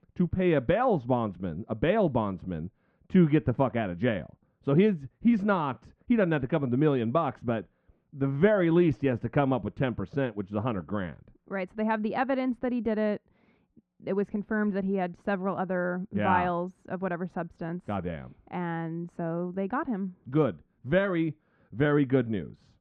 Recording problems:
muffled; very; fading above 1.5 kHz

